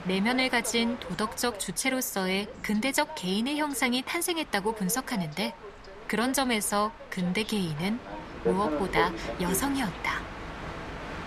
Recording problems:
train or aircraft noise; loud; throughout; 10 dB below the speech

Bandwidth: 14 kHz